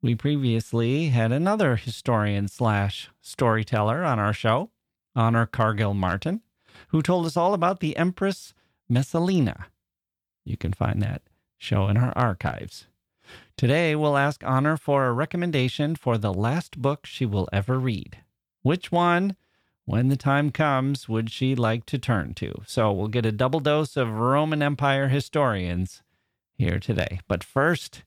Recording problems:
none

